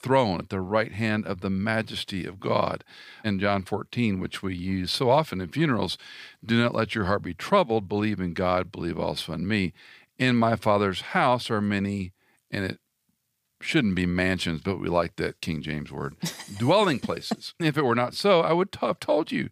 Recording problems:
none

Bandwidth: 15 kHz